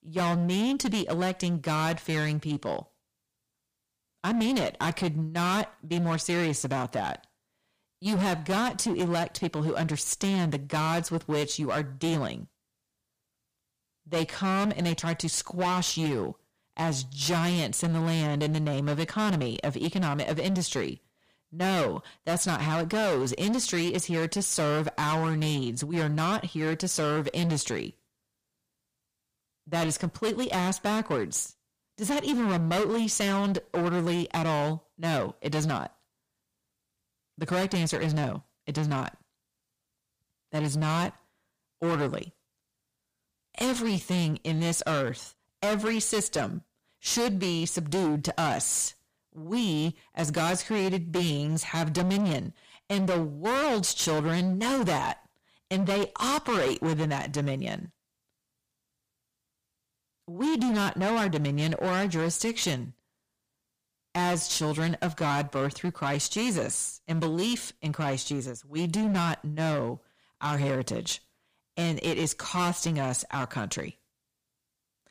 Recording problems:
distortion; heavy; 17% of the sound clipped

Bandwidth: 15 kHz